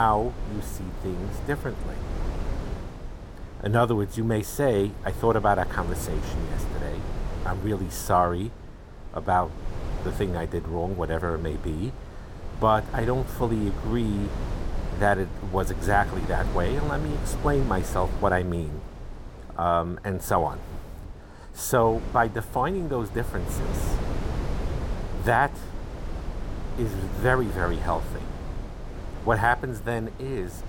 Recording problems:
wind noise on the microphone; occasional gusts; 15 dB below the speech
abrupt cut into speech; at the start

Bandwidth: 16.5 kHz